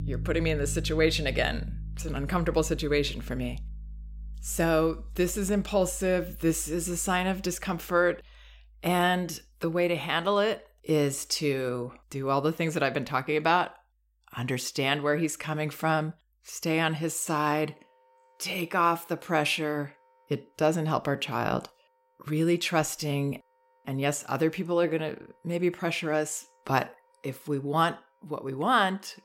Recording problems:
background music; noticeable; throughout; 10 dB below the speech

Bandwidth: 16 kHz